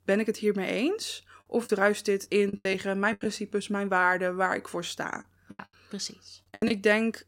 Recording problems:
choppy; very; from 1.5 to 3.5 s and from 5.5 to 6.5 s; 16% of the speech affected

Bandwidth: 16 kHz